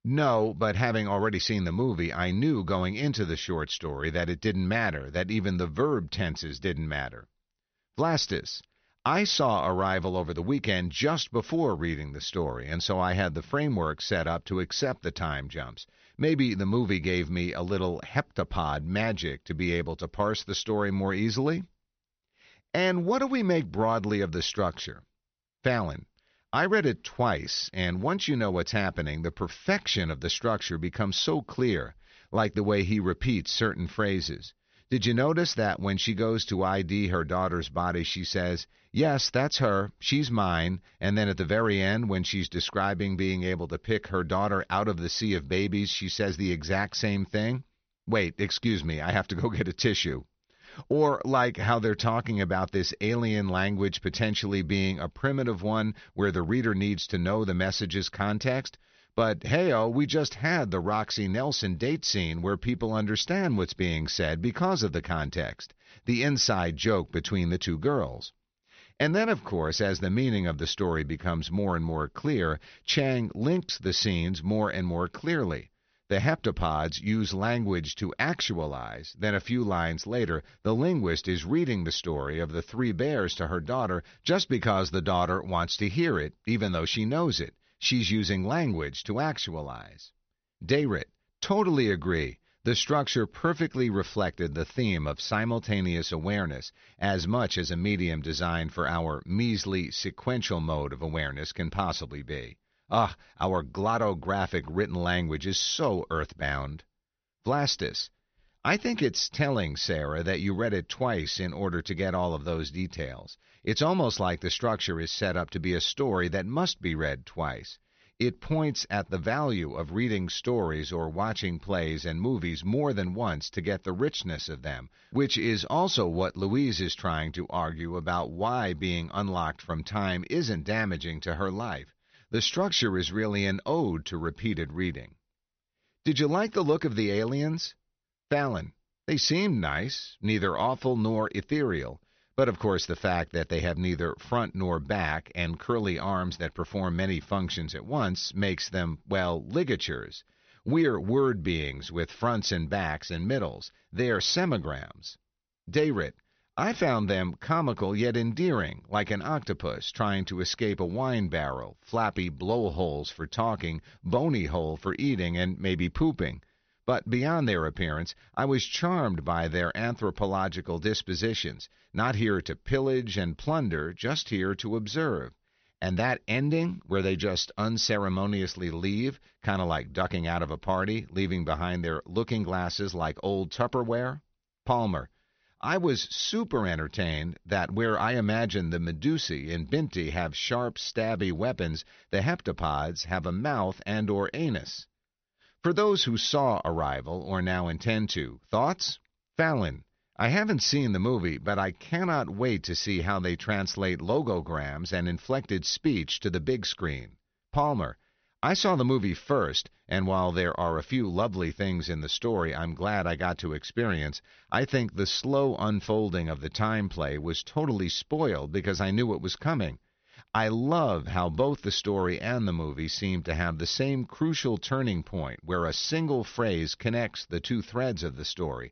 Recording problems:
high frequencies cut off; noticeable; nothing above 6 kHz

